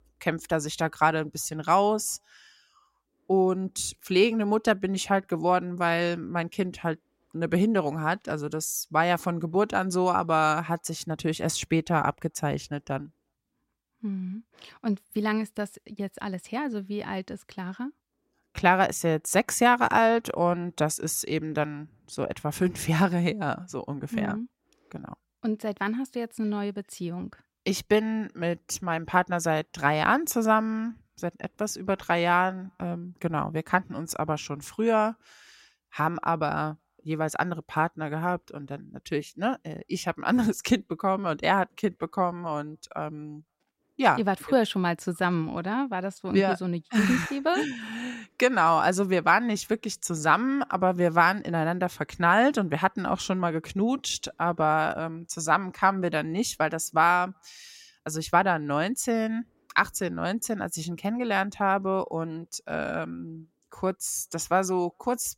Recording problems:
none

